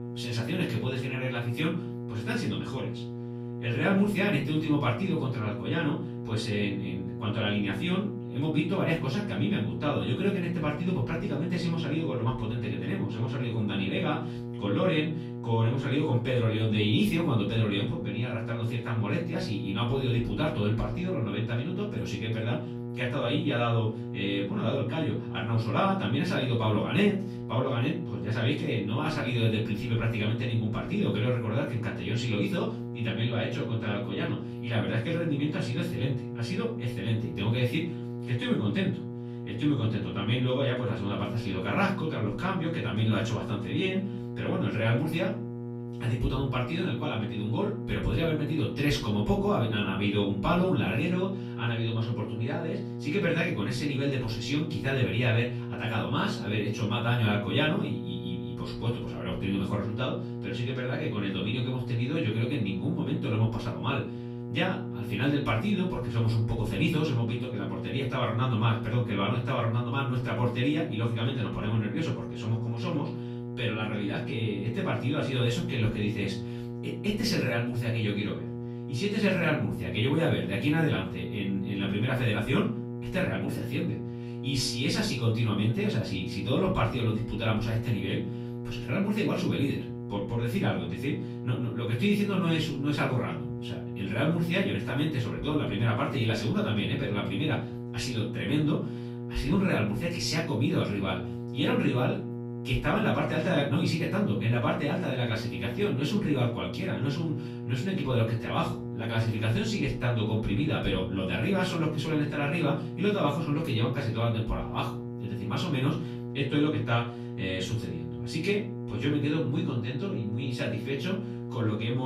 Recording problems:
off-mic speech; far
room echo; slight; dies away in 0.4 s
electrical hum; noticeable; throughout; 60 Hz, 10 dB below the speech
abrupt cut into speech; at the end

